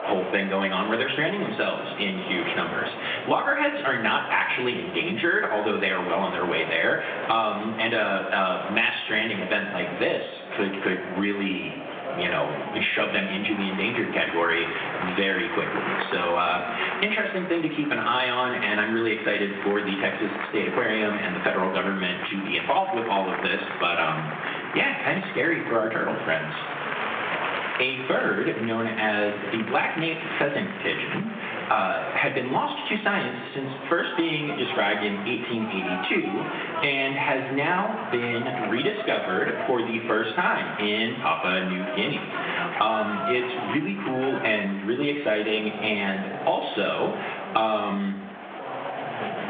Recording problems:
room echo; slight; dies away in 0.8 s
phone-call audio; nothing above 3.5 kHz
off-mic speech; somewhat distant
squashed, flat; somewhat, background pumping
crowd noise; loud; throughout; 10 dB below the speech
voice in the background; noticeable; throughout; 20 dB below the speech

